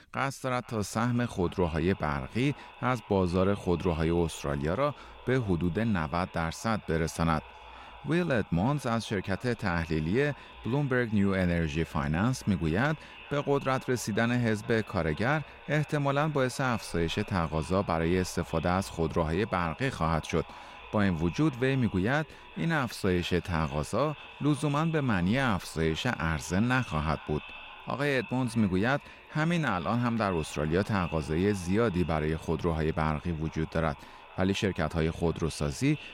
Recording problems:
echo of what is said; noticeable; throughout; 460 ms later, 20 dB below the speech

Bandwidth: 16 kHz